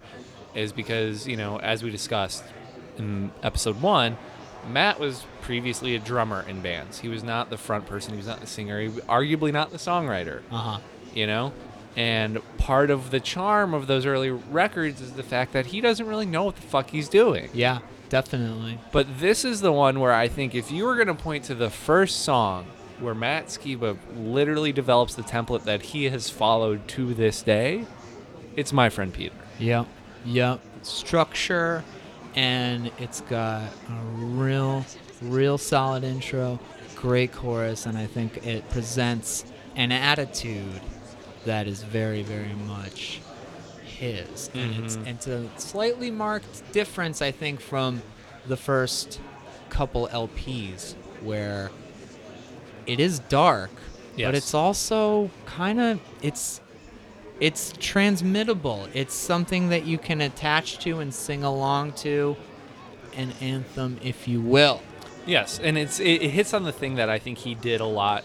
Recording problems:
murmuring crowd; noticeable; throughout; 20 dB below the speech

